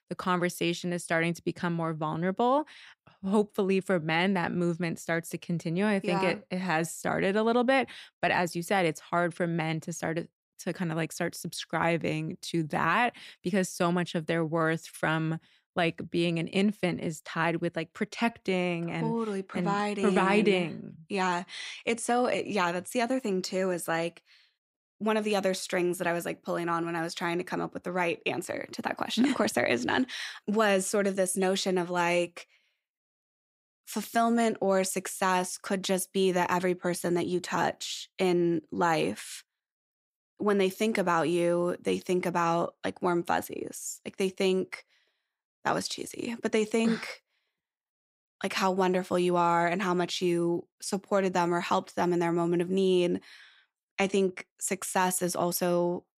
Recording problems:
none

